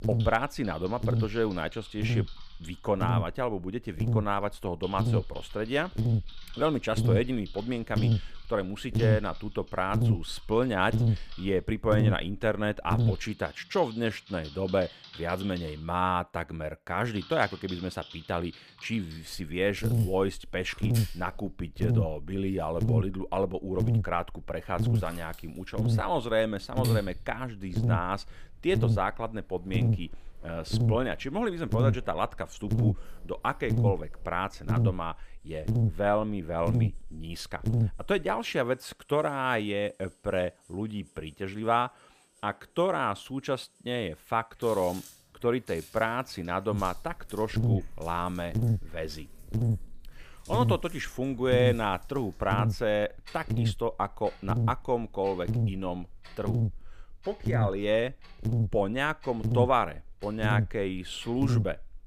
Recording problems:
electrical hum; loud; until 13 s, from 19 to 38 s and from 47 s on; 50 Hz, 10 dB below the speech
household noises; noticeable; throughout; 20 dB below the speech

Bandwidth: 15 kHz